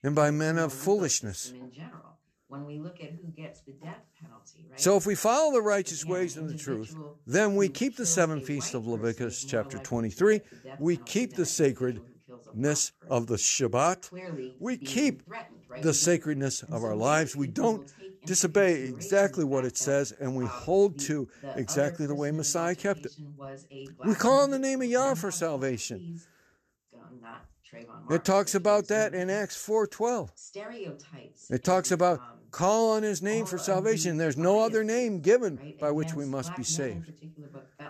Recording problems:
voice in the background; noticeable; throughout; 15 dB below the speech

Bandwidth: 13.5 kHz